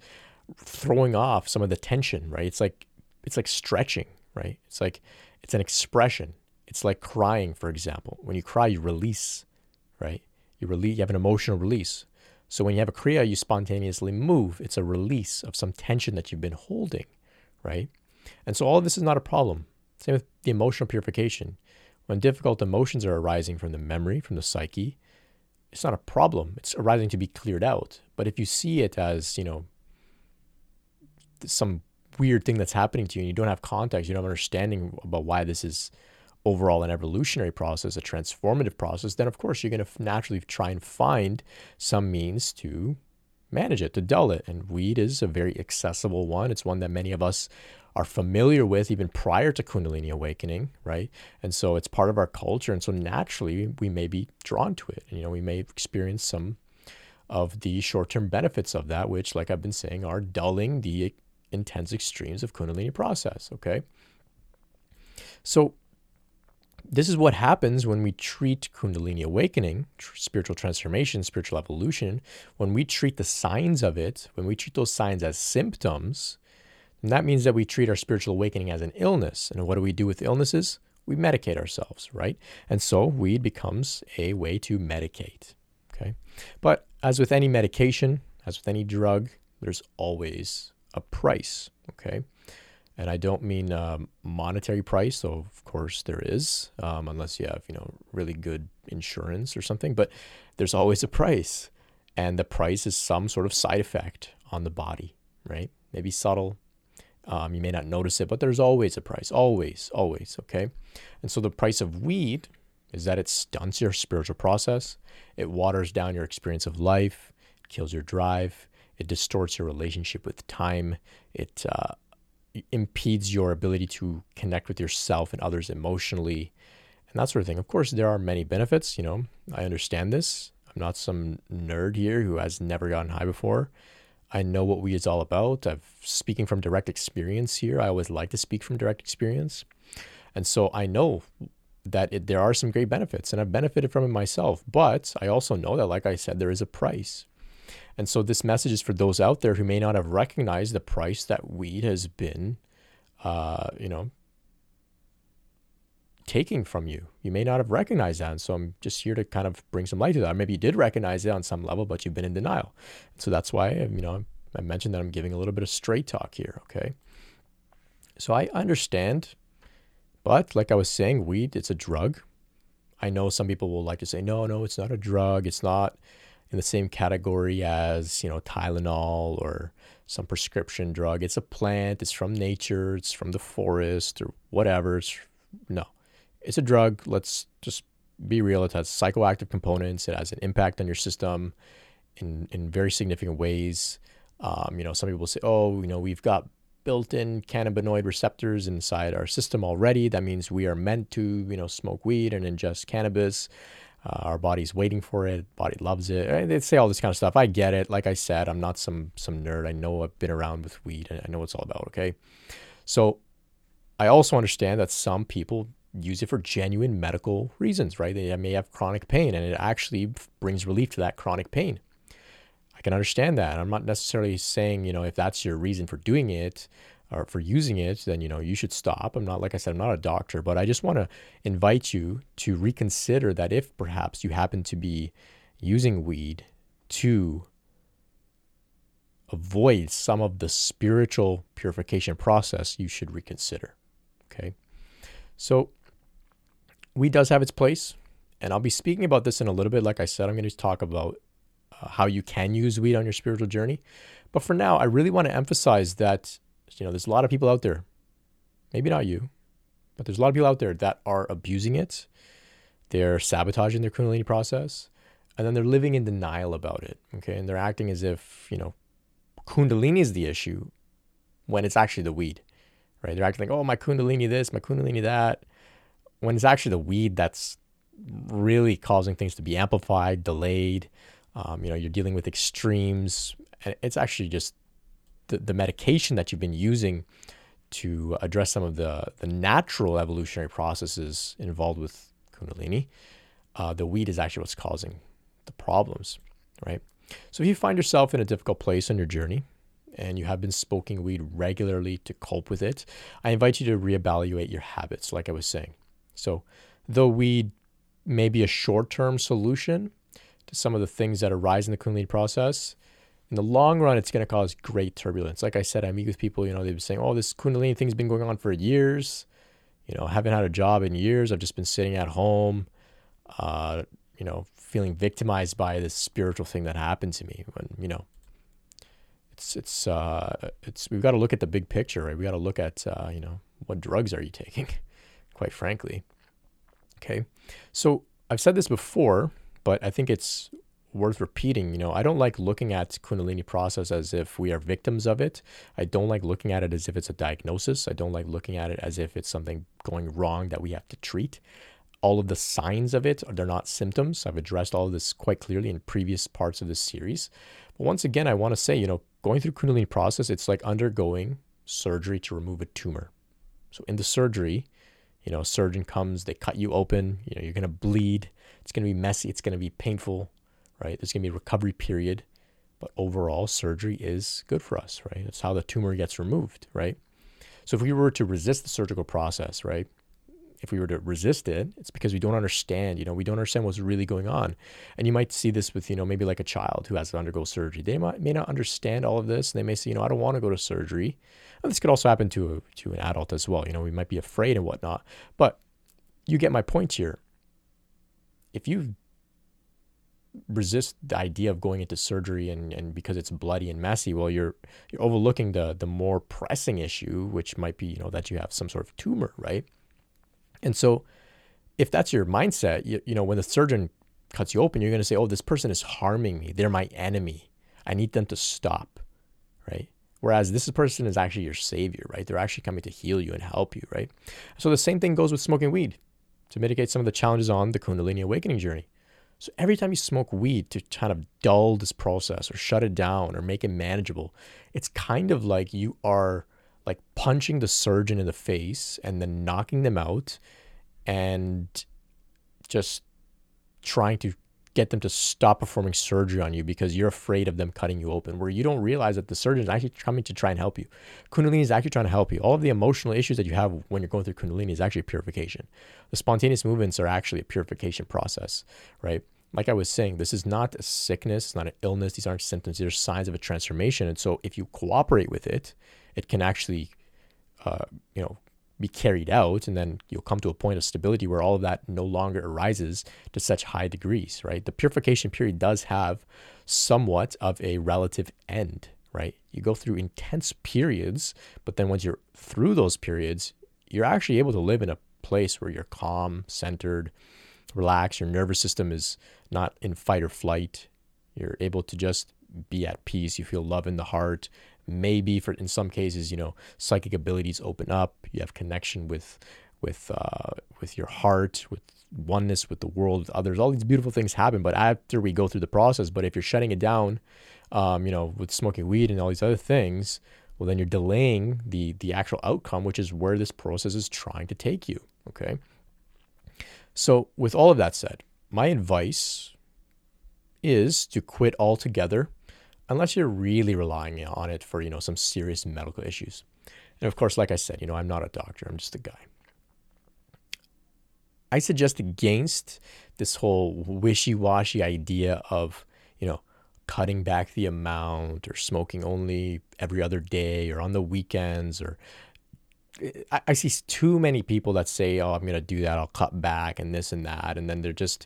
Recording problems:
none

